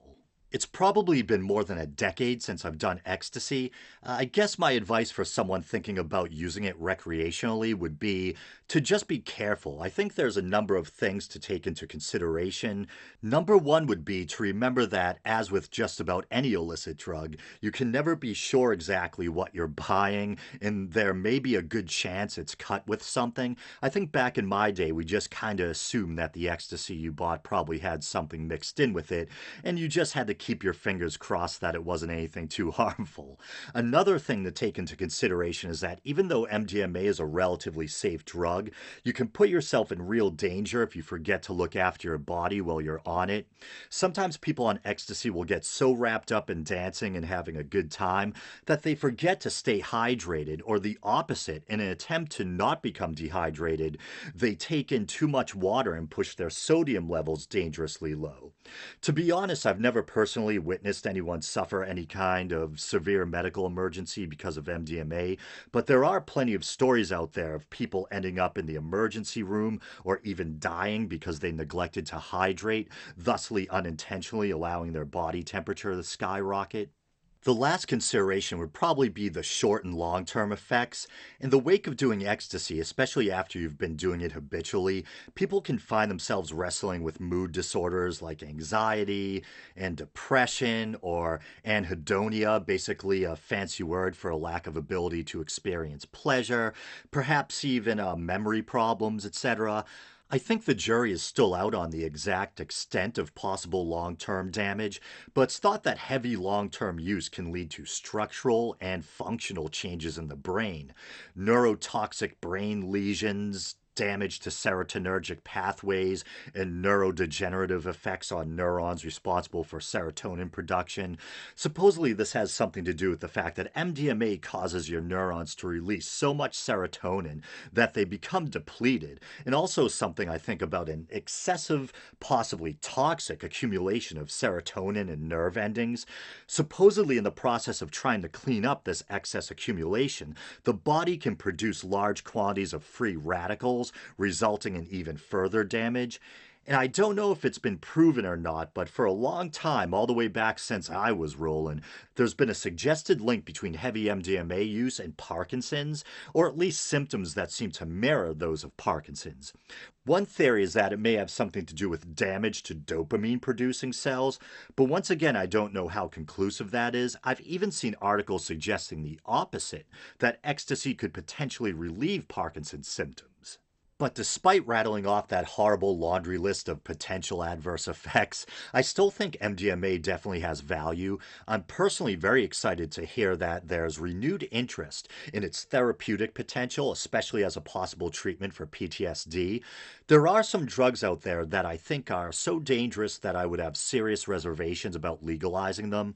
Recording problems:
garbled, watery; slightly; nothing above 8.5 kHz

